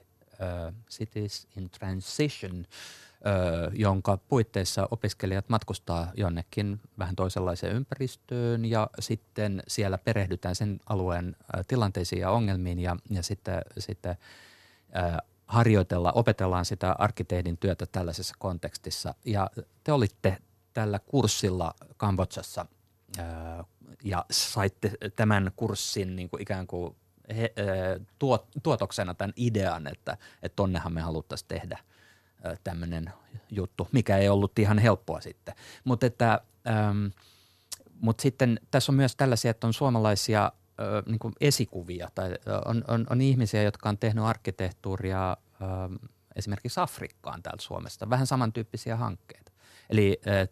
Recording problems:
none

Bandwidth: 13.5 kHz